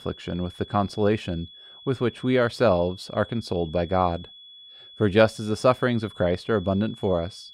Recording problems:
high-pitched whine; noticeable; throughout; 3.5 kHz, 20 dB below the speech

